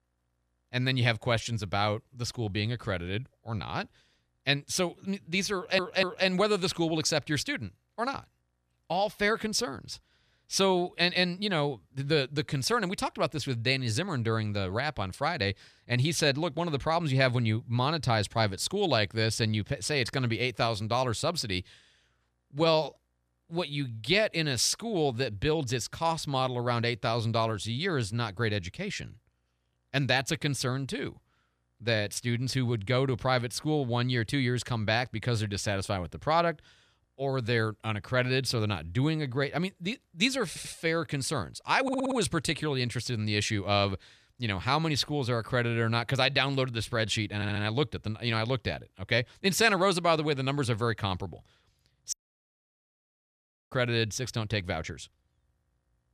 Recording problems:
audio stuttering; 4 times, first at 5.5 s
audio cutting out; at 52 s for 1.5 s

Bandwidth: 14 kHz